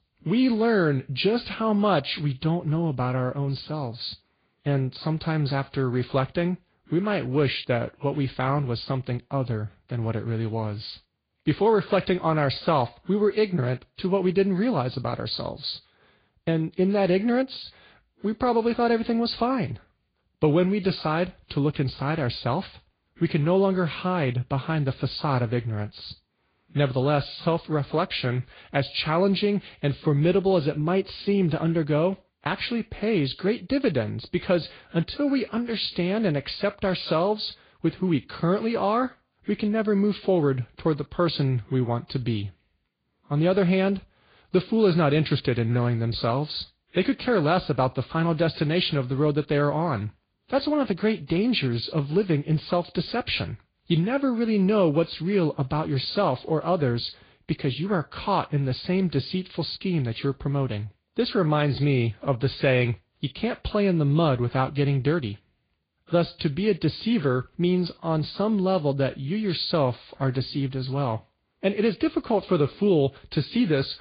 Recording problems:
high frequencies cut off; severe; nothing above 5 kHz
garbled, watery; slightly

